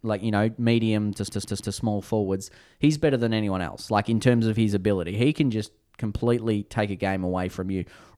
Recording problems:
audio stuttering; at 1 s

